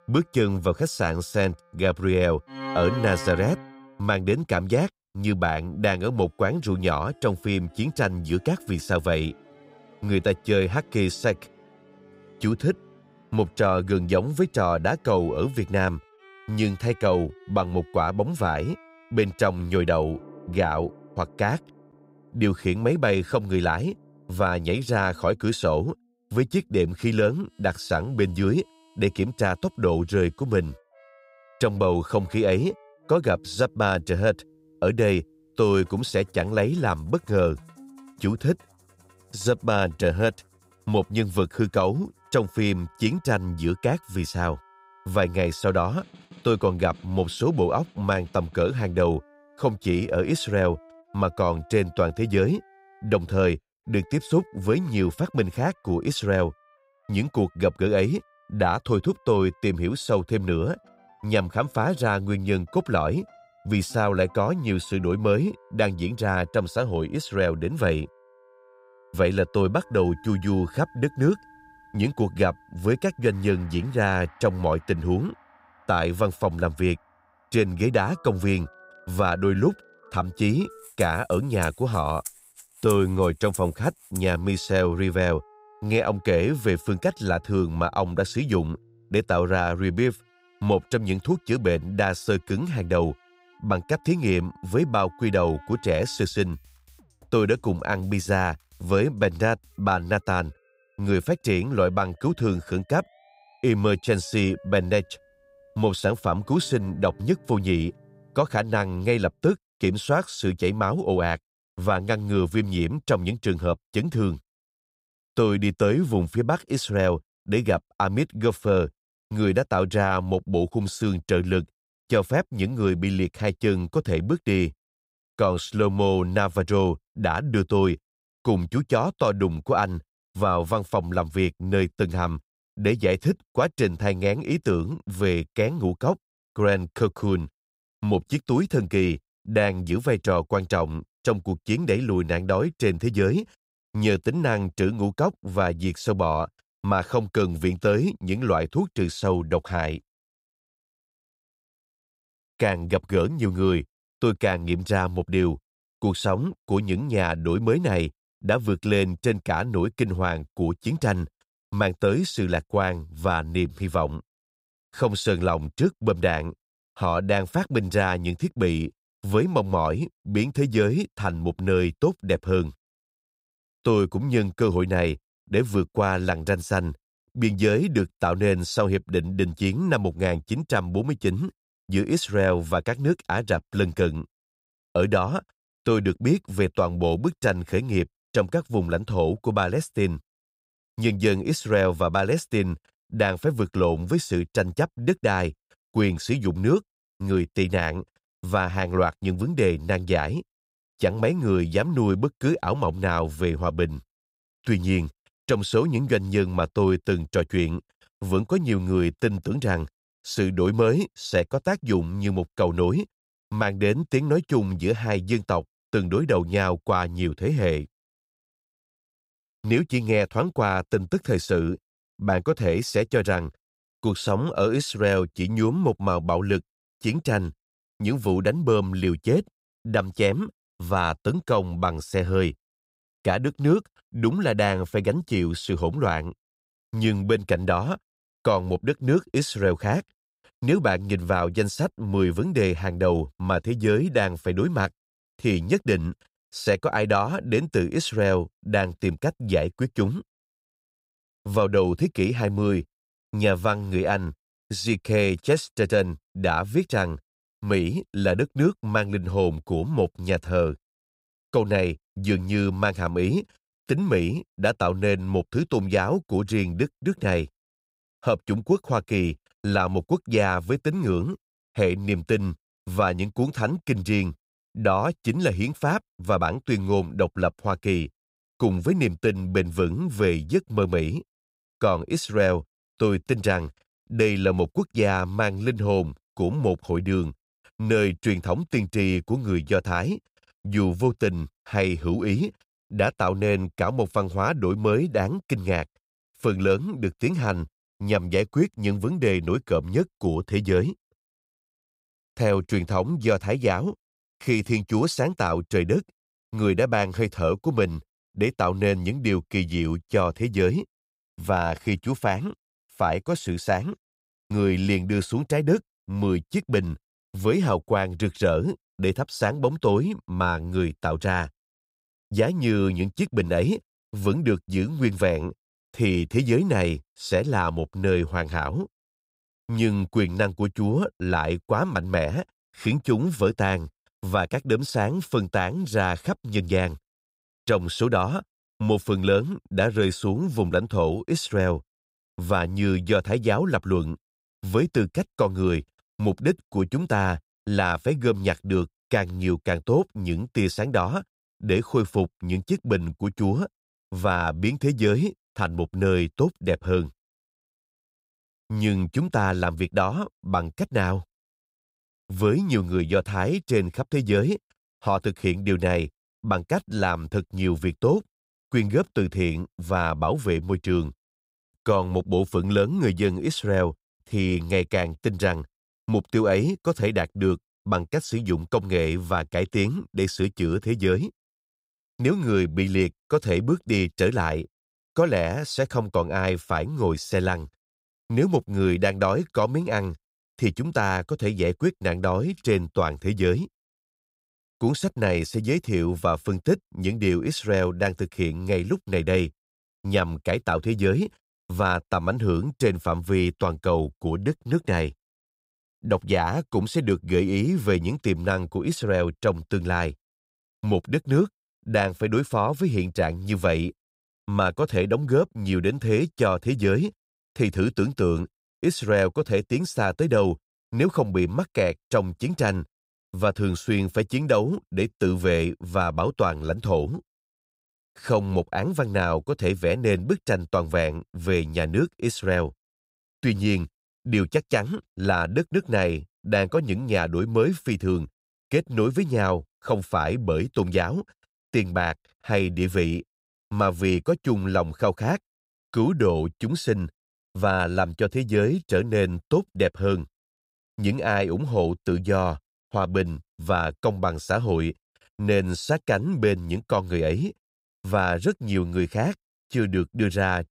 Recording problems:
background music; faint; until 1:49; 25 dB below the speech

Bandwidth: 15.5 kHz